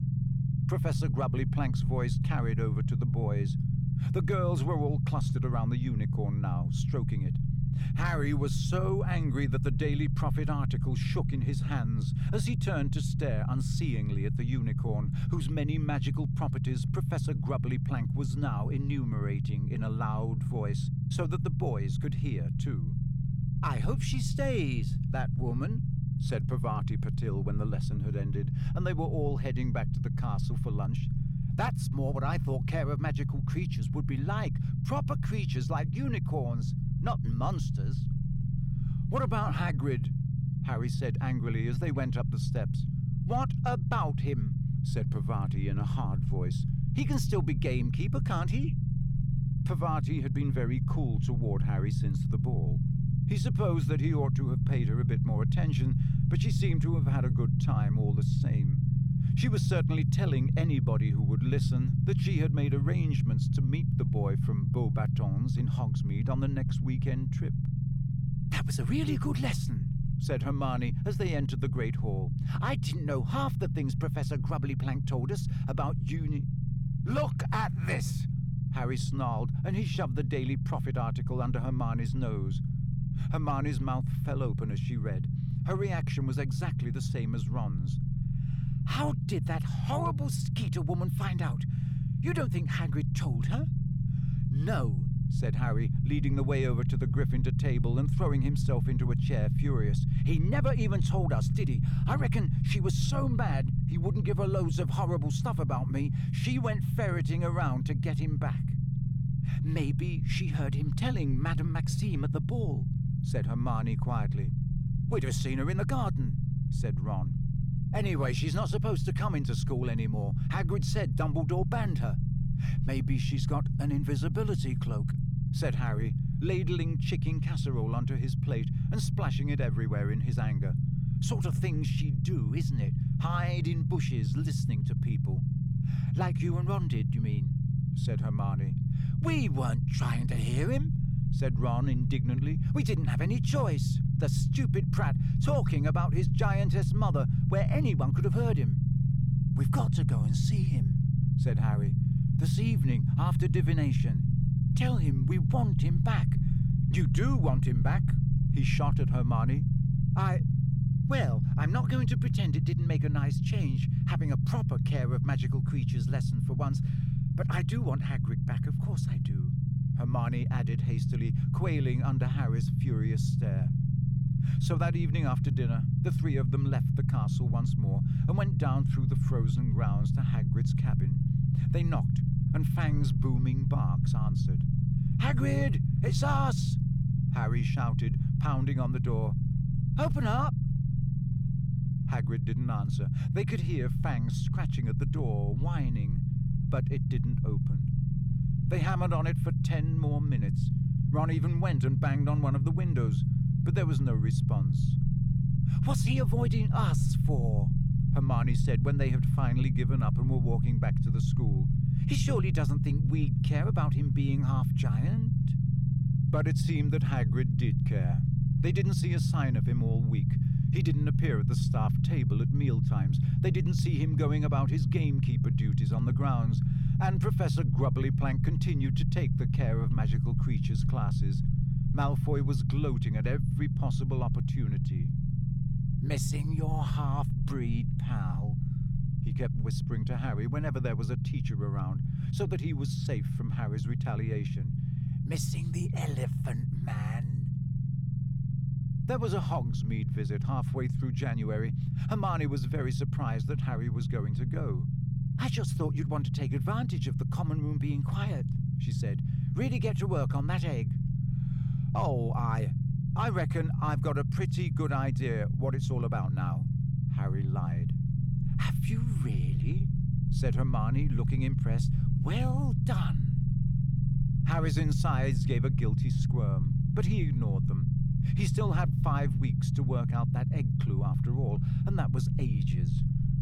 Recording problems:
low rumble; loud; throughout; 2 dB below the speech

